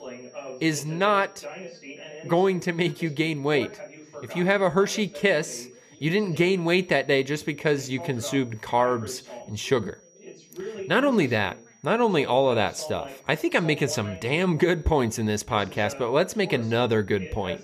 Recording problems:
background chatter; noticeable; throughout; 2 voices, 15 dB below the speech
high-pitched whine; faint; throughout; 6 kHz, 30 dB below the speech

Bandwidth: 14.5 kHz